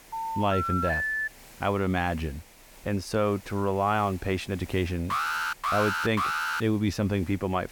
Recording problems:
hiss; faint; throughout; 20 dB below the speech
phone ringing; loud; until 1.5 s; peak 1 dB above the speech
alarm; loud; from 5 to 6.5 s; peak 2 dB above the speech

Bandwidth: 18 kHz